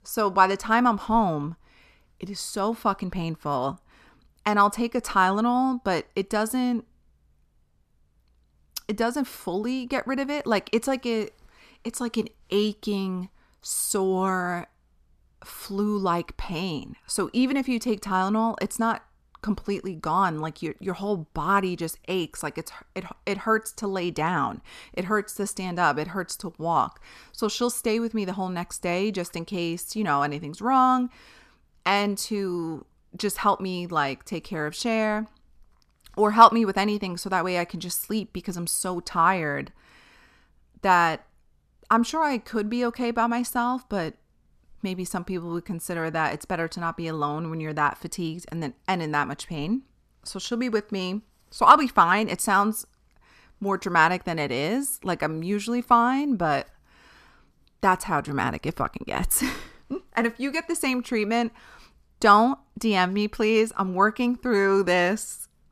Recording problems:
none

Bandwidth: 14 kHz